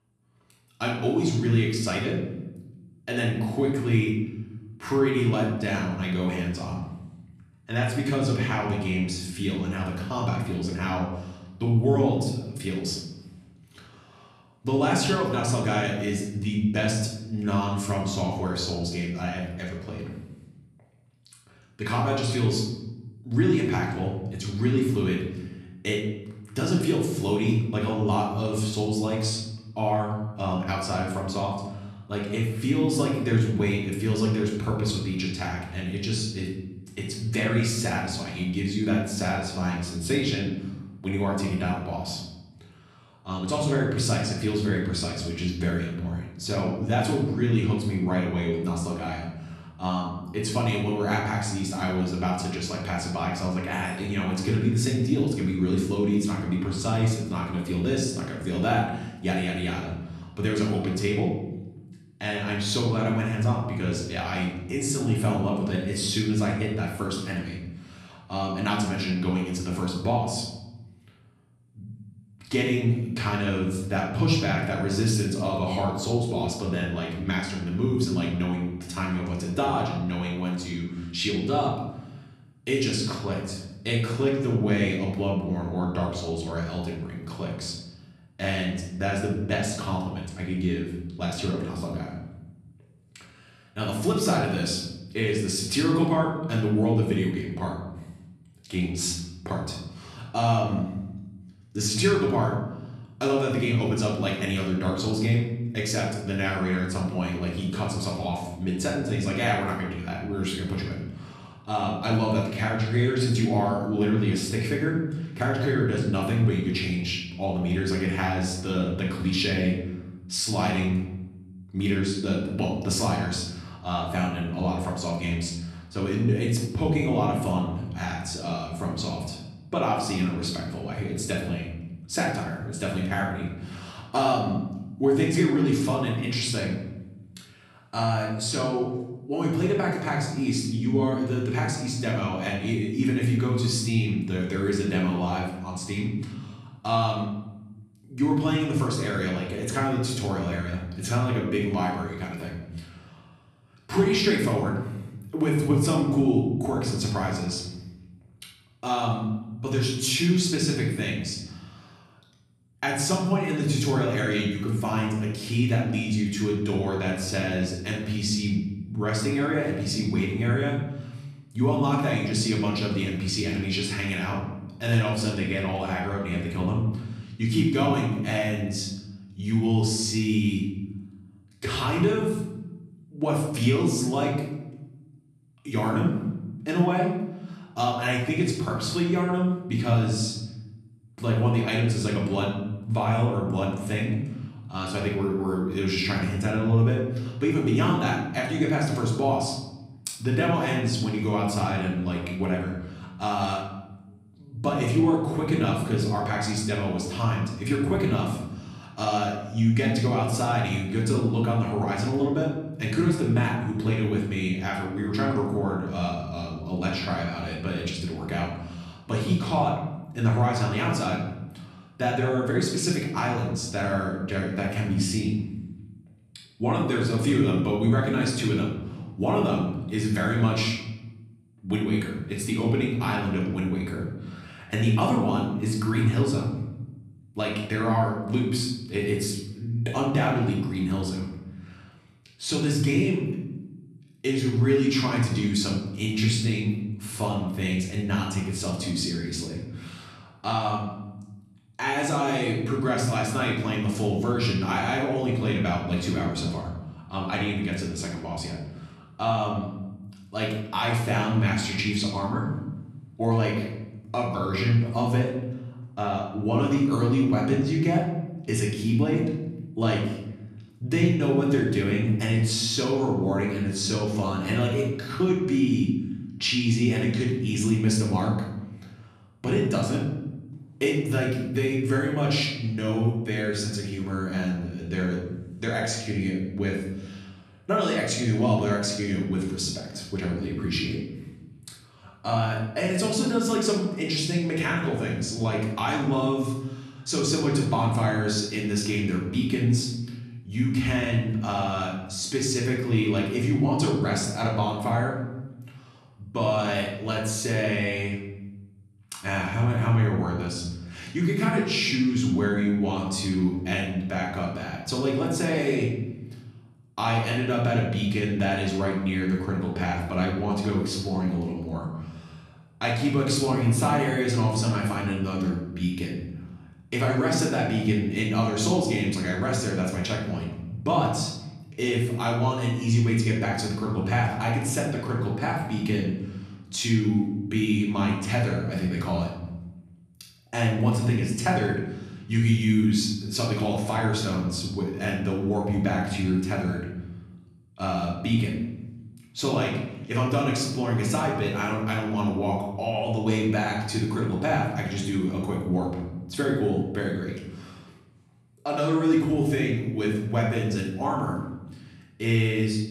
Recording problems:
off-mic speech; far
room echo; noticeable; dies away in 1 s

